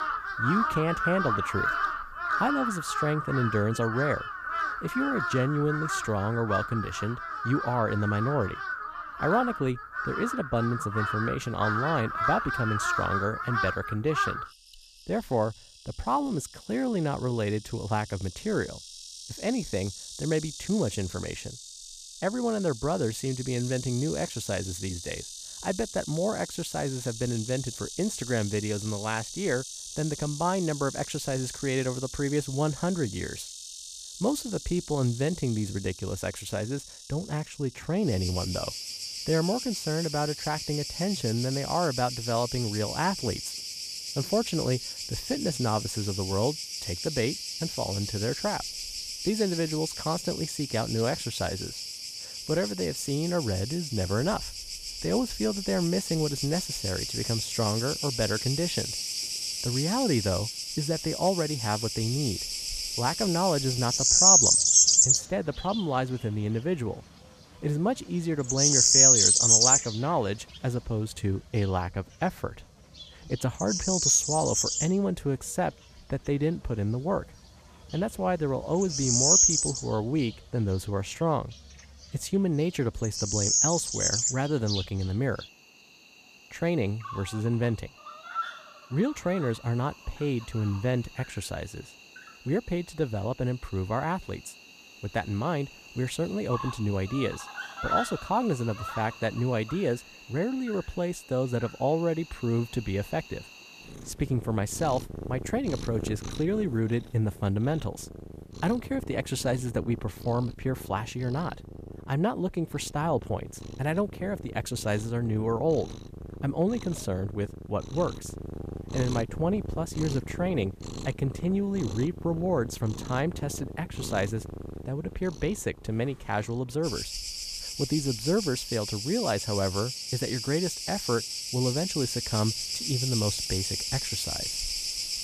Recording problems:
animal sounds; very loud; throughout; 2 dB above the speech

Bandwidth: 14.5 kHz